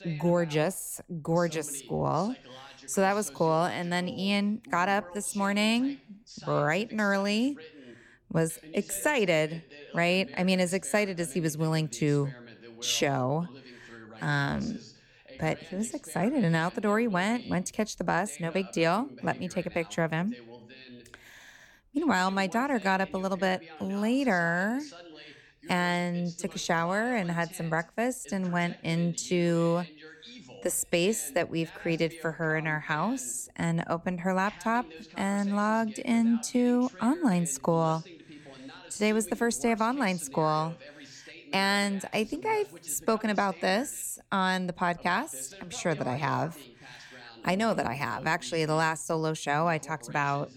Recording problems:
voice in the background; noticeable; throughout; 20 dB below the speech

